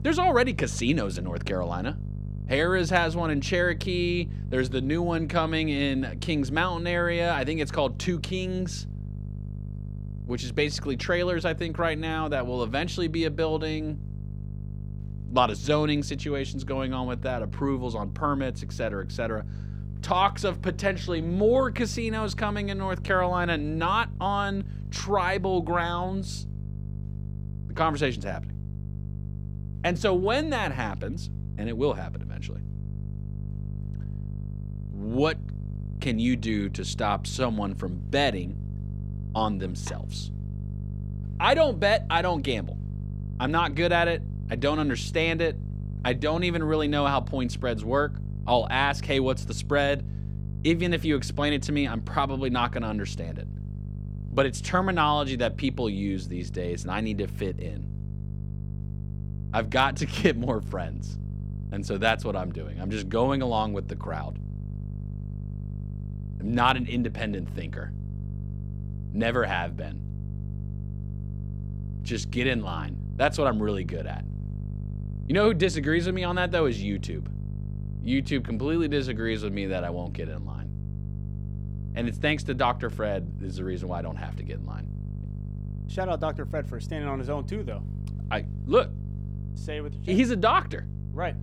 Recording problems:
electrical hum; faint; throughout; 50 Hz, 20 dB below the speech

